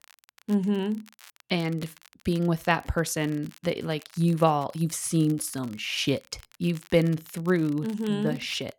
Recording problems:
crackle, like an old record; faint; 25 dB below the speech

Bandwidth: 18 kHz